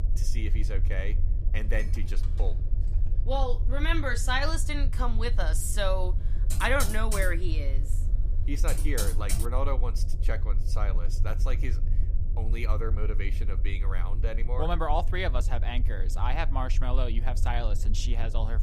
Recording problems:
low rumble; noticeable; throughout; 15 dB below the speech
clattering dishes; faint; from 1.5 to 3 s; peak 20 dB below the speech
keyboard typing; loud; from 6.5 to 9.5 s; peak 1 dB above the speech

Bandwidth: 14.5 kHz